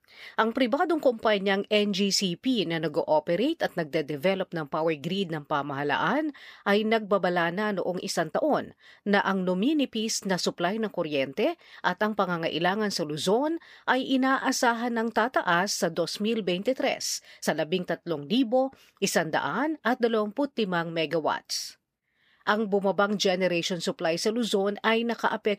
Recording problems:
uneven, jittery; slightly; from 1 to 18 s

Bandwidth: 15 kHz